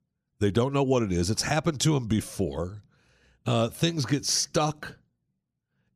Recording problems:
none

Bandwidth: 14.5 kHz